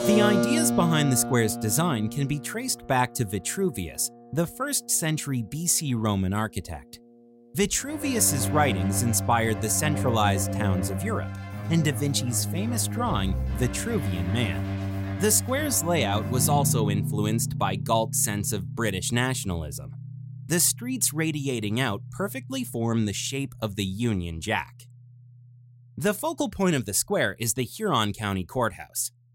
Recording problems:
background music; loud; throughout; 5 dB below the speech

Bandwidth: 16 kHz